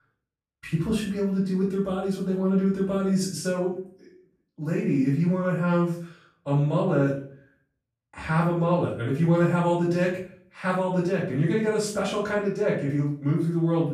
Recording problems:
off-mic speech; far
room echo; noticeable; dies away in 0.4 s

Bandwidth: 14.5 kHz